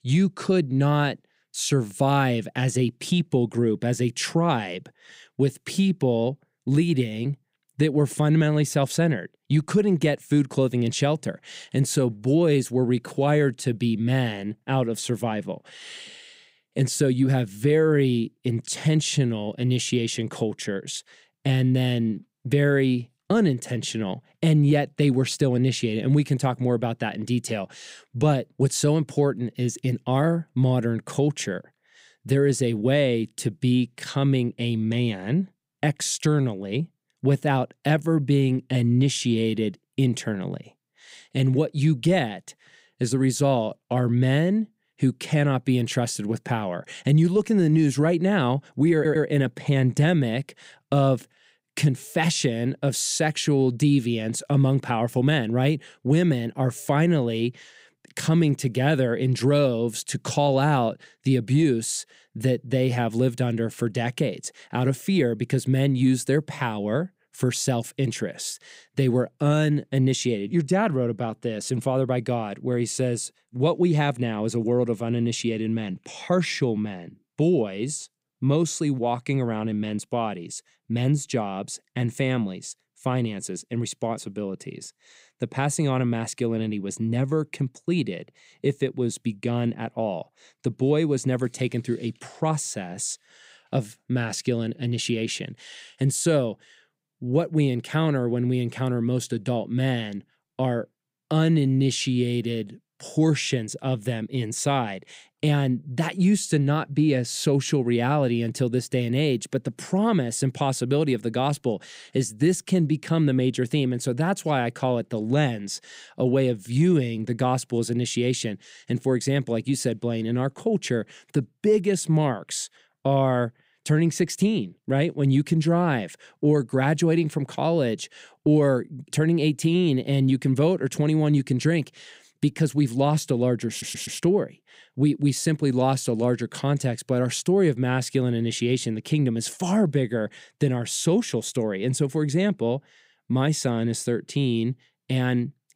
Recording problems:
audio stuttering; at 49 s and at 2:14

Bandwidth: 15.5 kHz